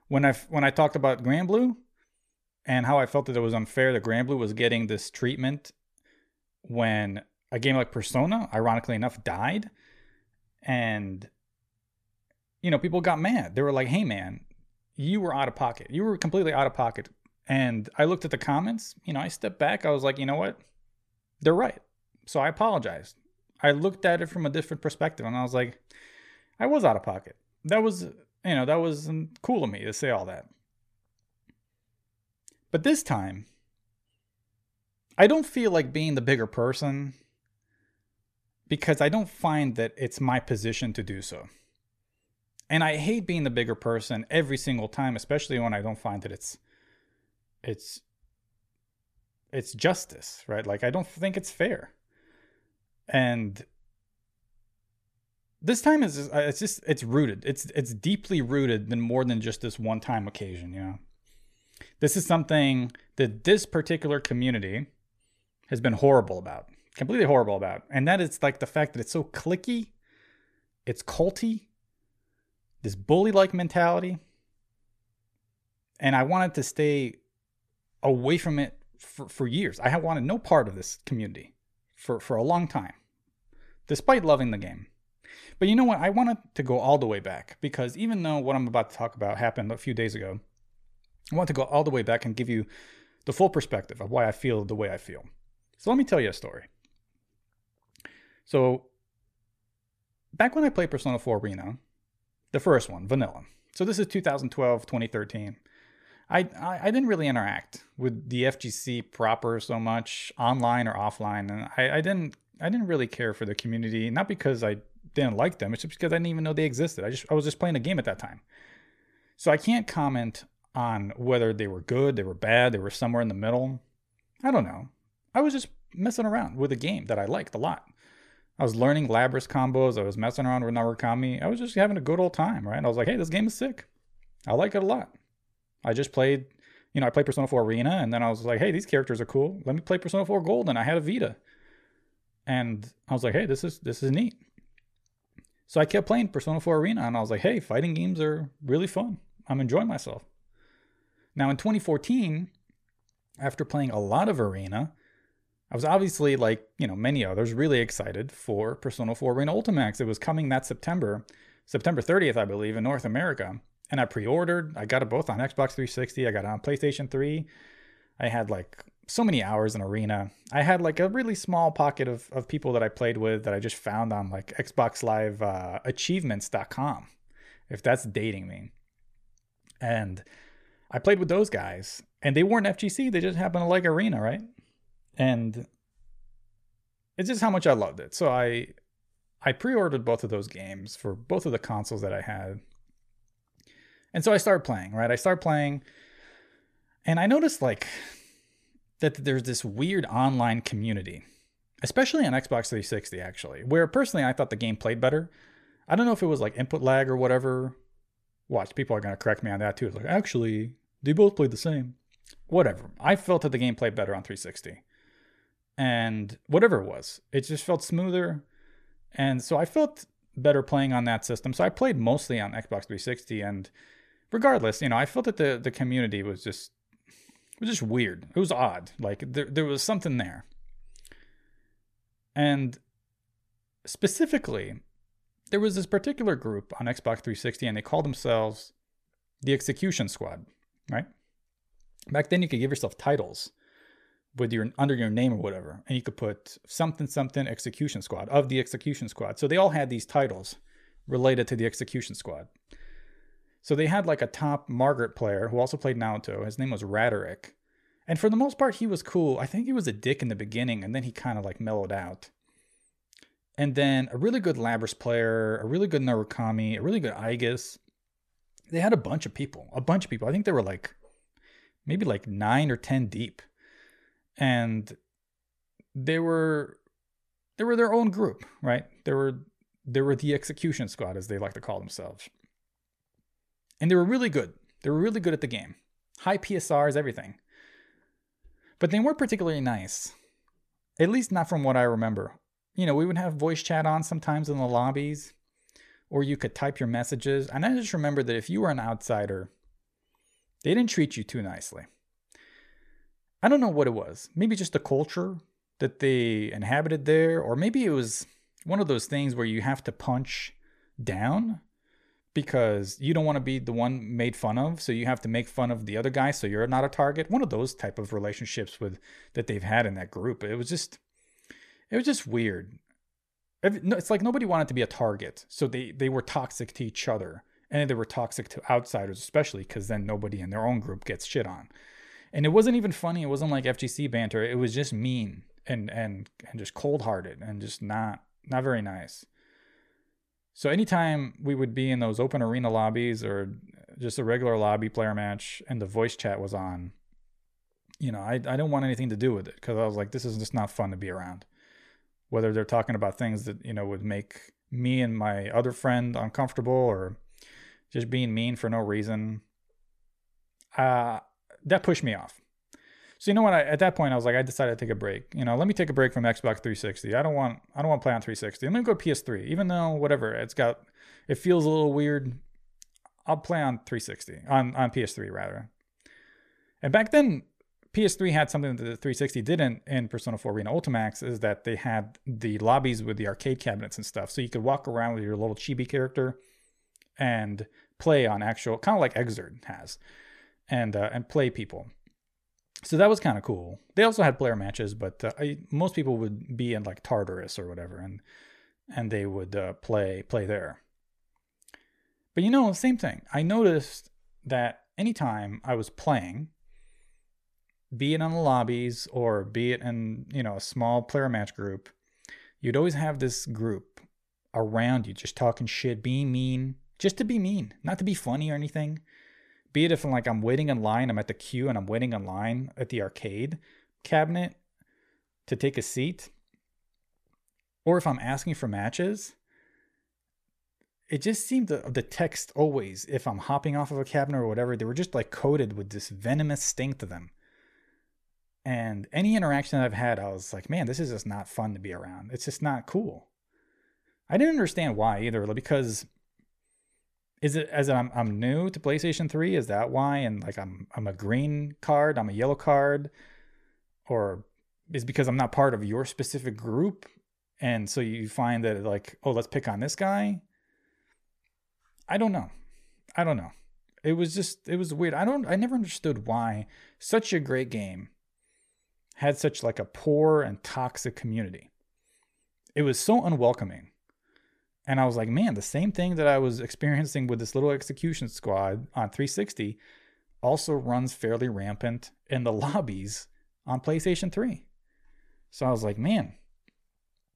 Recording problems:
uneven, jittery; strongly; from 21 s to 6:47

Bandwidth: 14.5 kHz